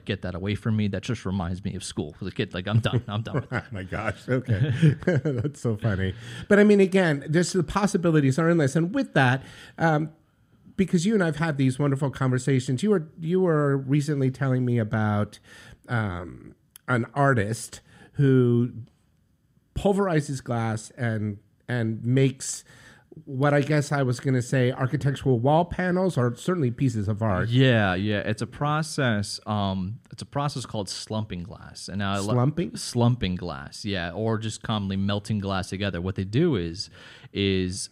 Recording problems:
none

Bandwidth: 15.5 kHz